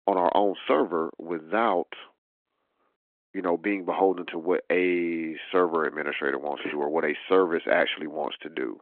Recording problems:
phone-call audio

